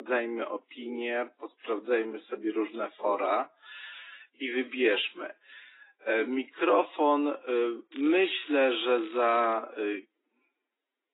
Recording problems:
garbled, watery; badly; nothing above 3.5 kHz
wrong speed, natural pitch; too slow; 0.6 times normal speed
thin; somewhat; fading below 300 Hz
crackling; faint; from 8 to 9.5 s; 20 dB below the speech
abrupt cut into speech; at the start

